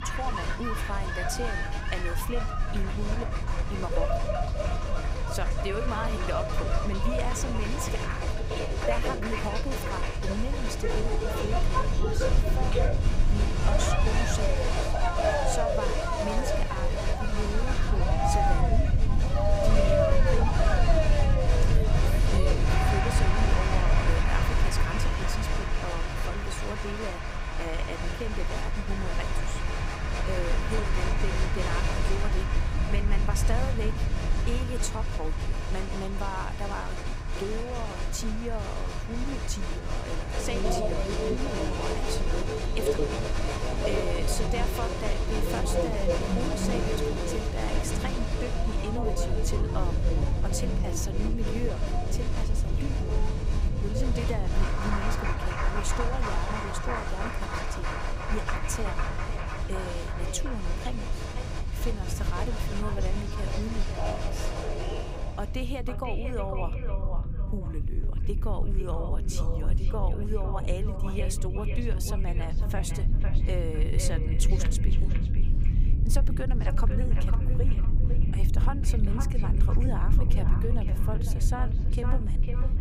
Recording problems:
echo of what is said; strong; from 58 s on; 500 ms later, 8 dB below the speech
crowd noise; very loud; until 1:05; 4 dB above the speech
low rumble; loud; throughout; 8 dB below the speech
crackling; faint; 4 times, first at 16 s; 25 dB below the speech

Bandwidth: 15.5 kHz